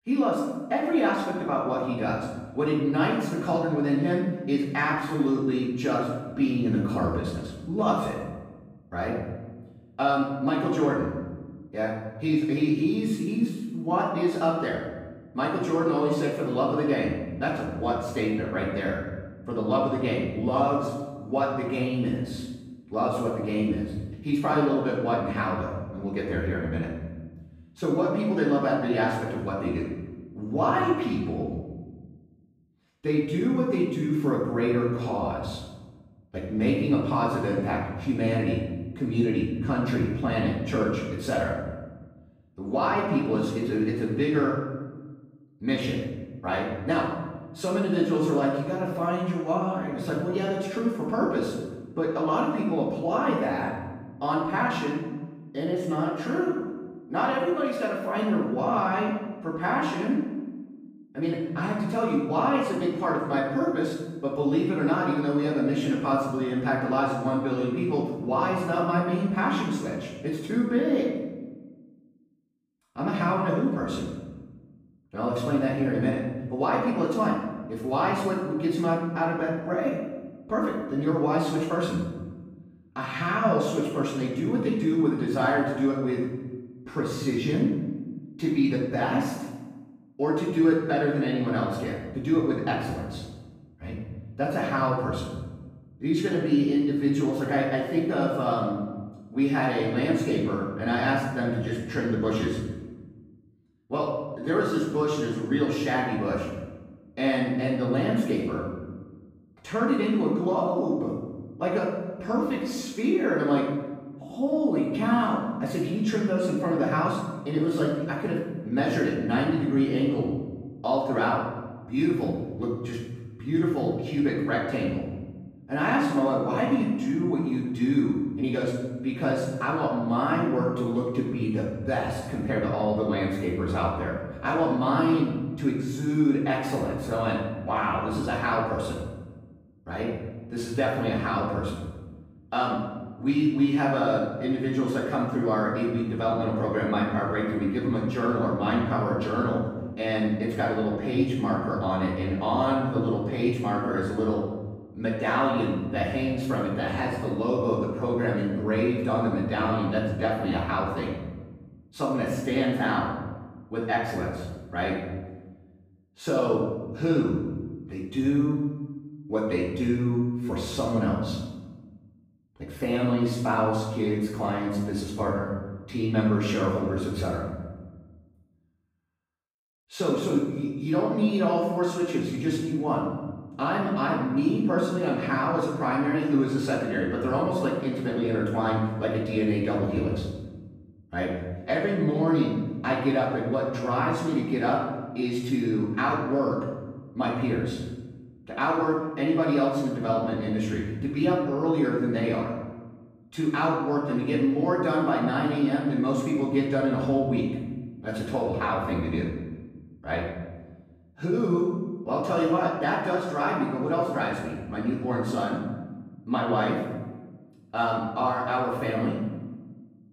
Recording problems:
off-mic speech; far
room echo; noticeable; dies away in 1.1 s

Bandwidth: 15.5 kHz